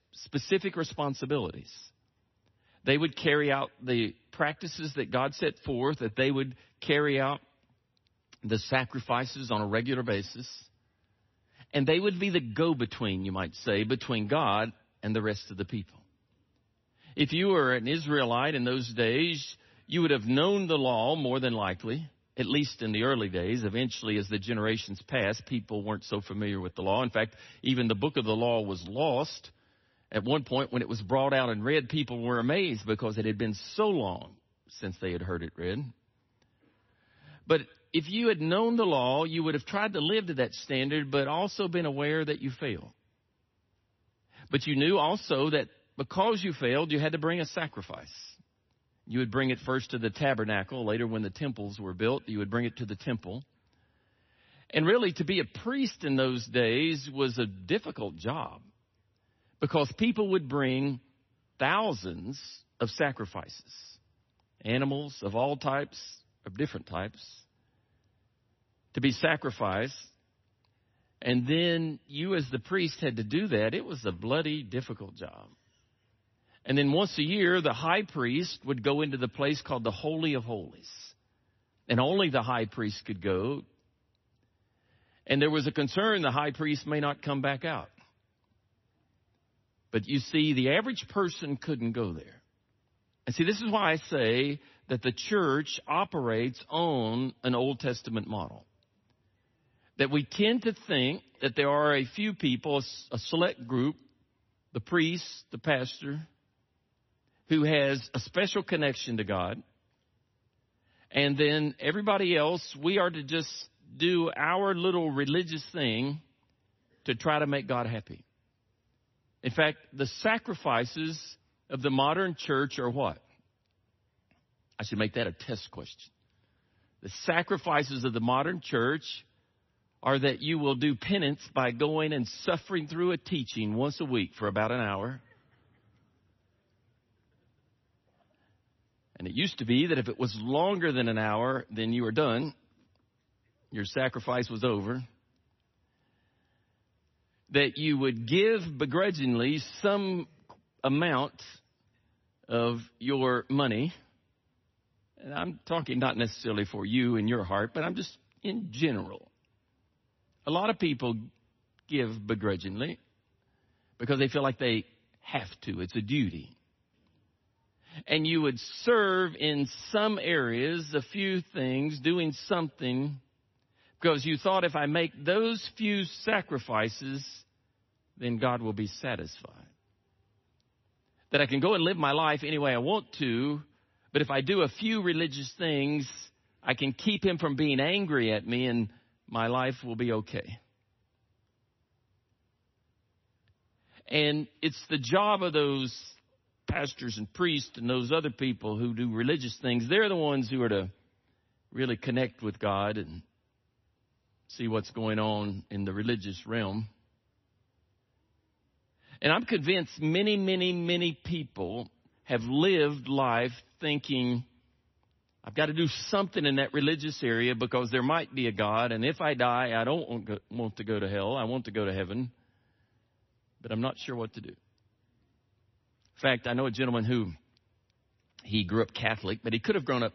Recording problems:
garbled, watery; slightly; nothing above 6 kHz

